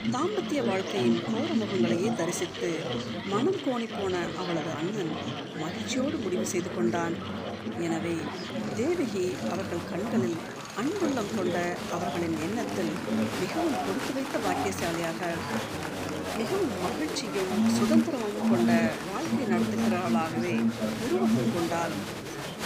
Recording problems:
murmuring crowd; very loud; throughout; as loud as the speech
machinery noise; noticeable; throughout; 10 dB below the speech

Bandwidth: 15 kHz